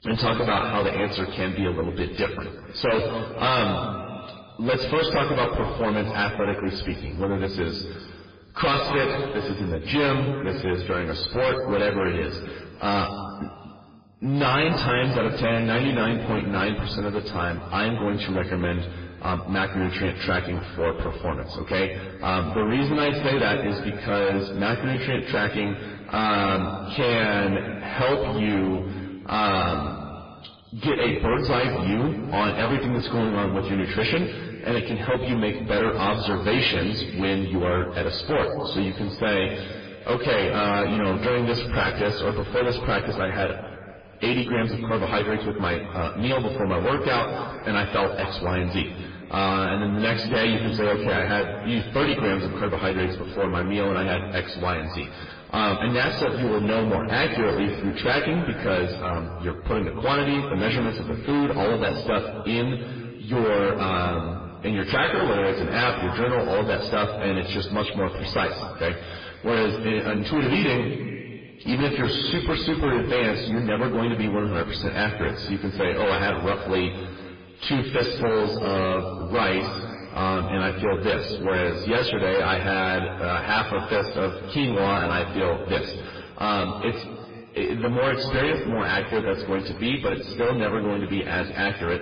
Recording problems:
distortion; heavy; 18% of the sound clipped
off-mic speech; far
garbled, watery; badly
room echo; noticeable; dies away in 1.8 s

